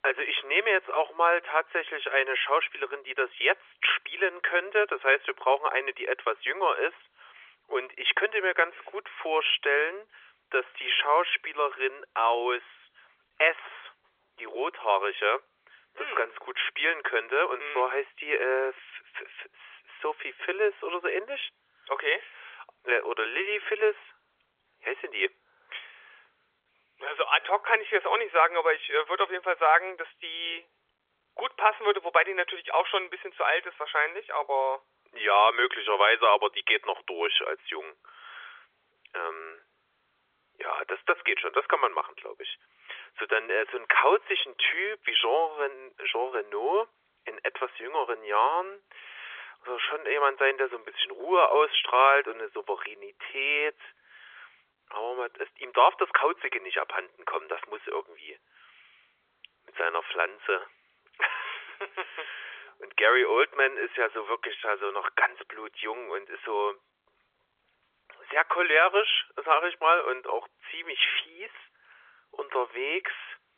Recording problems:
phone-call audio; nothing above 3.5 kHz

